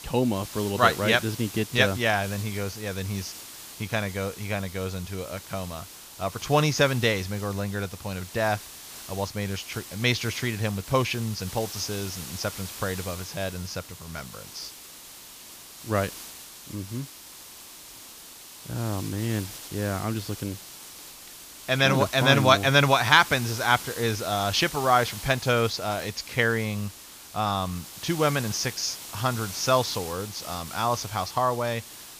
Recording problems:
high frequencies cut off; noticeable; nothing above 7 kHz
hiss; noticeable; throughout; 15 dB below the speech

